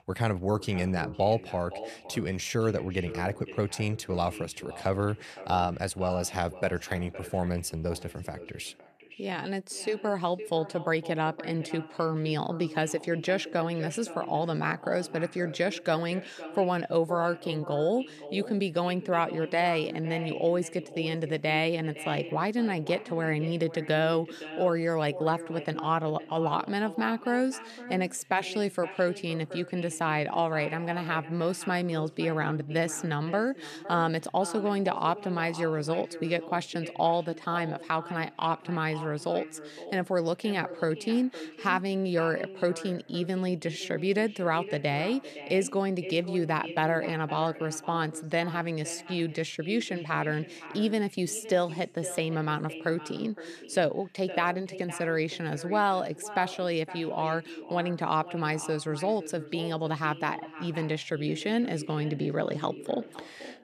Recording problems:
echo of what is said; noticeable; throughout; 510 ms later, 15 dB below the speech

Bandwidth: 13.5 kHz